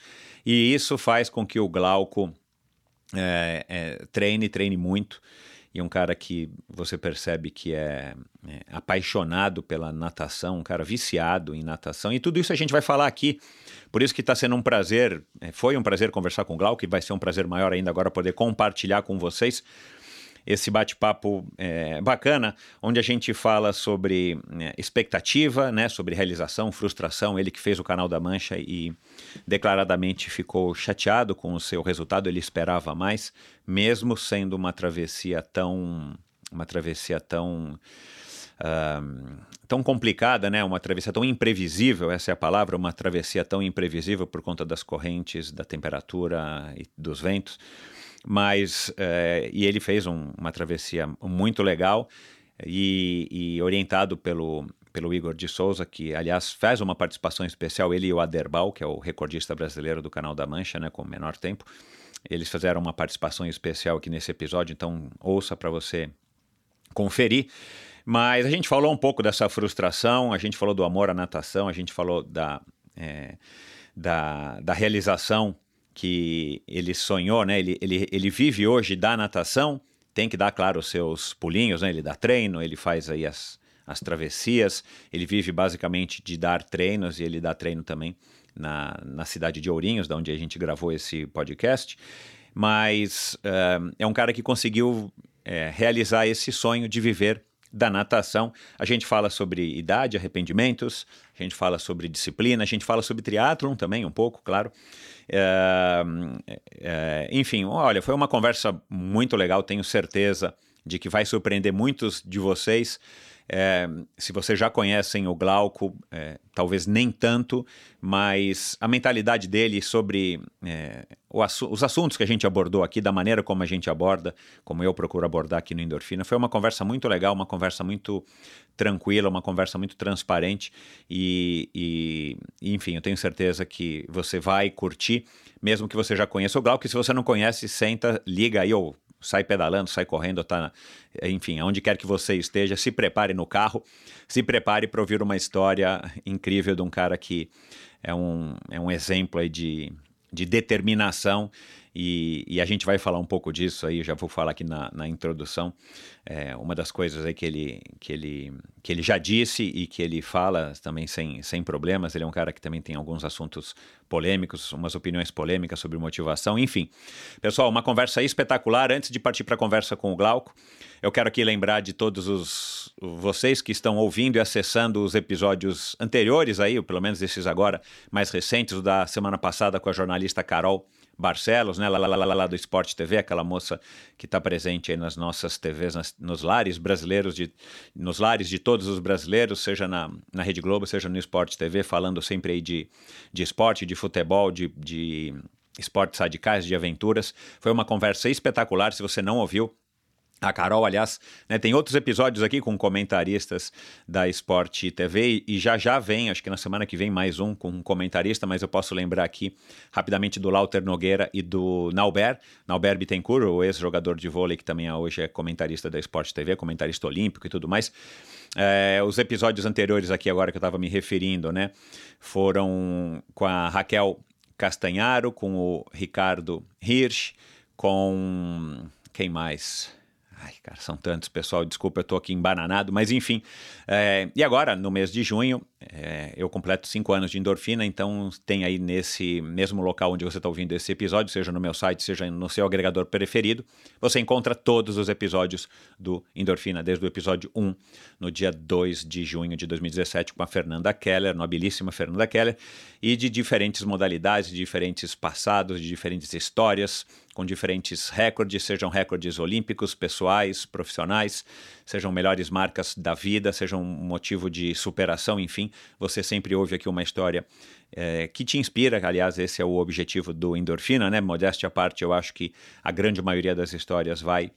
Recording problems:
audio stuttering; at 3:02

